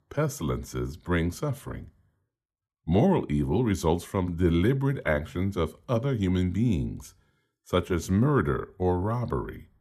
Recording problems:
none

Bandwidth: 14 kHz